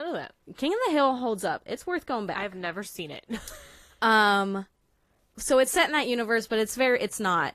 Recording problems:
garbled, watery; slightly; nothing above 14.5 kHz
abrupt cut into speech; at the start

